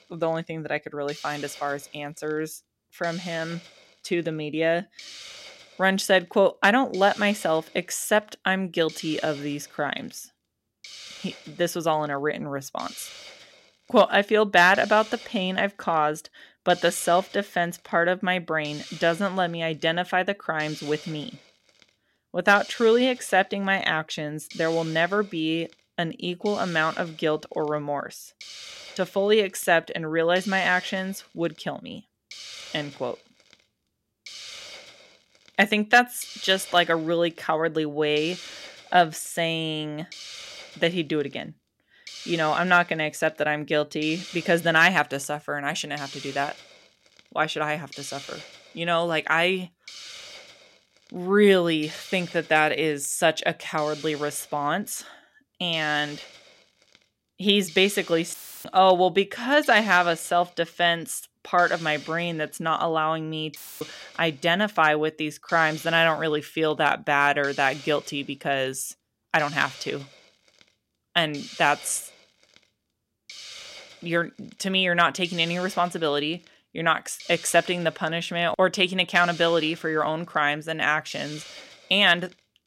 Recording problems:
hiss; noticeable; throughout; 20 dB below the speech
audio cutting out; filled with static; at 58 s and at 1:04

